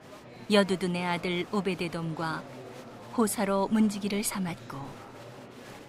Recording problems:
murmuring crowd; noticeable; throughout; 15 dB below the speech

